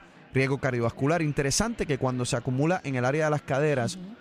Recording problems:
murmuring crowd; faint; throughout; 25 dB below the speech

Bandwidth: 15 kHz